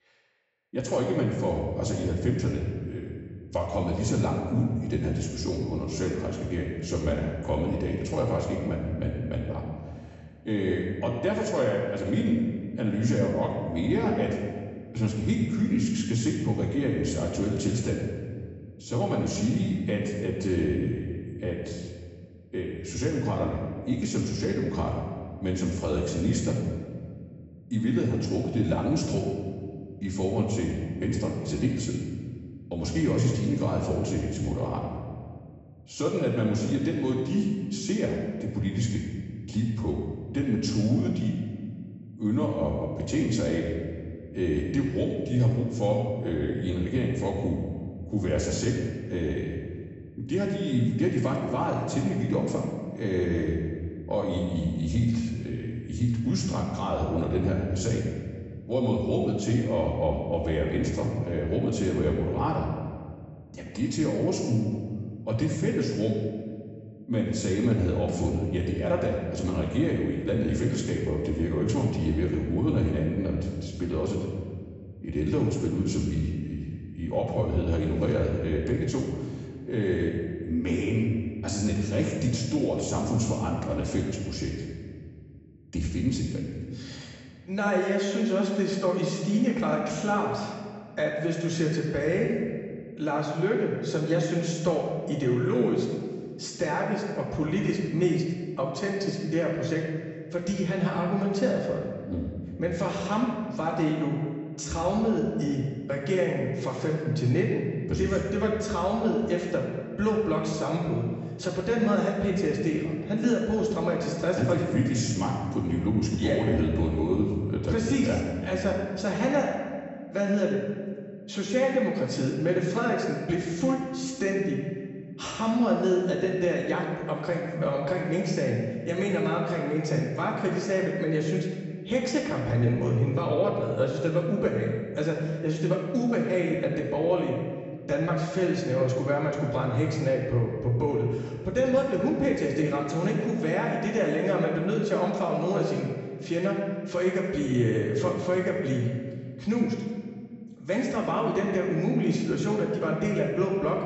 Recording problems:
off-mic speech; far
room echo; noticeable; dies away in 1.6 s
high frequencies cut off; noticeable; nothing above 7.5 kHz

